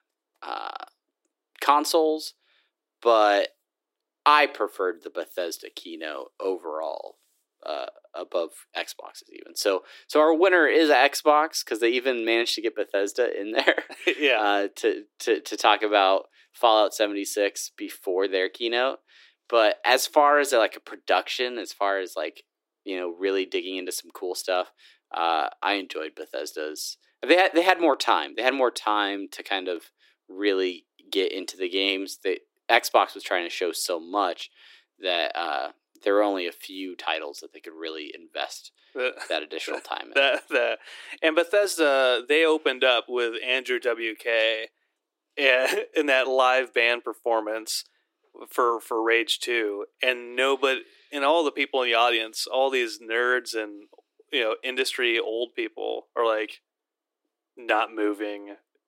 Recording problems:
thin; very; fading below 300 Hz

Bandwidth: 16 kHz